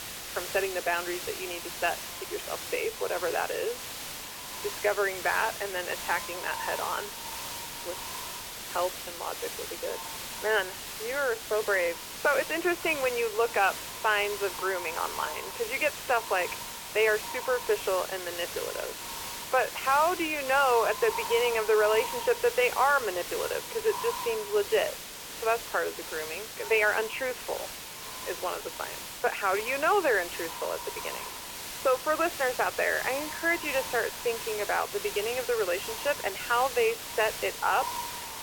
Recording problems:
phone-call audio; poor line; nothing above 3 kHz
echo of what is said; noticeable; throughout; 540 ms later, 15 dB below the speech
hiss; loud; throughout; 8 dB below the speech

